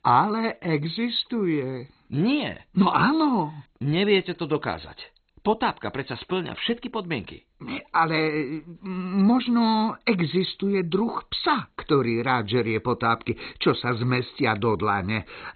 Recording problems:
garbled, watery; badly; nothing above 4 kHz

